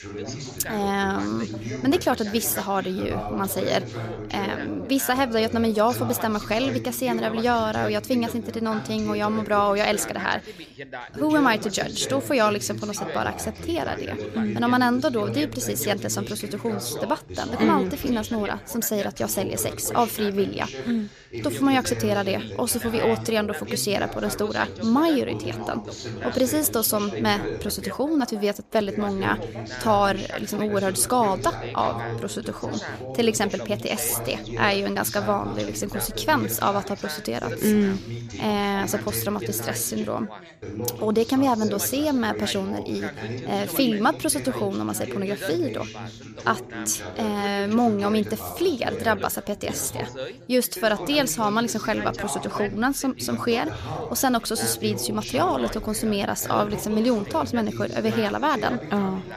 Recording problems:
background chatter; loud; throughout; 3 voices, 9 dB below the speech

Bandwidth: 14.5 kHz